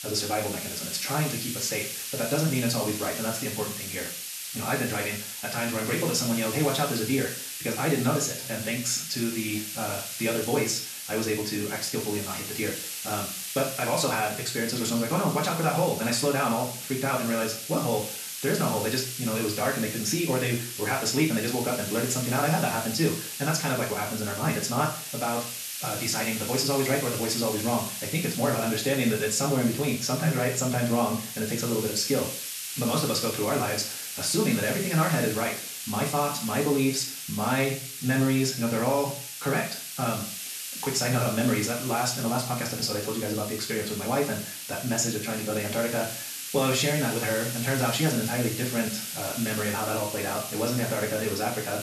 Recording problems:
wrong speed, natural pitch; too fast; 1.6 times normal speed
room echo; slight; dies away in 0.4 s
off-mic speech; somewhat distant
hiss; loud; throughout; 6 dB below the speech

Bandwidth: 13.5 kHz